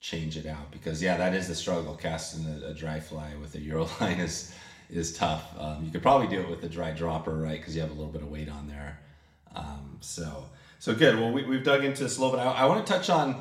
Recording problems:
room echo; slight; dies away in 0.7 s
off-mic speech; somewhat distant

